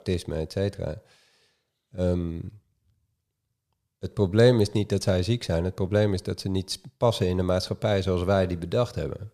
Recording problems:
none

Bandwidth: 14.5 kHz